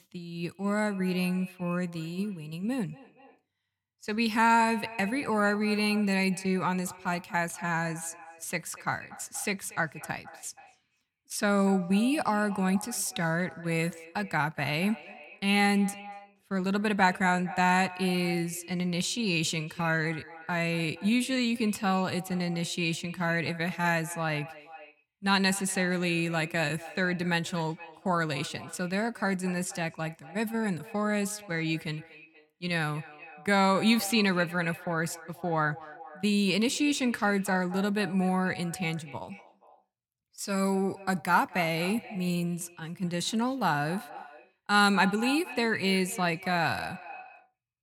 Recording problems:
echo of what is said; noticeable; throughout; 240 ms later, 15 dB below the speech

